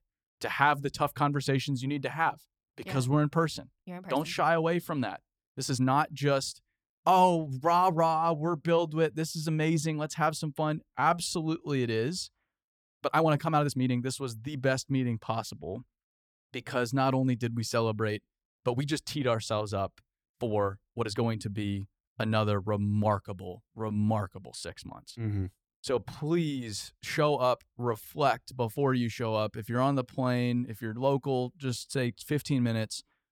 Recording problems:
uneven, jittery; strongly; from 3 to 32 s

